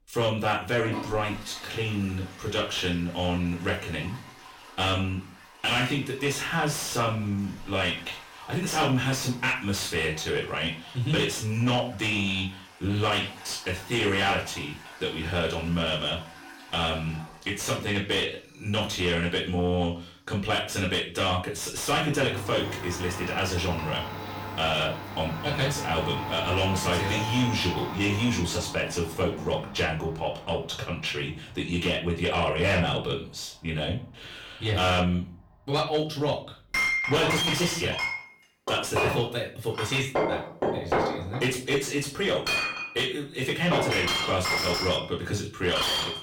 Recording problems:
distortion; heavy; 6 dB below the speech
off-mic speech; far
room echo; slight; dies away in 0.3 s
household noises; loud; throughout; 3 dB below the speech

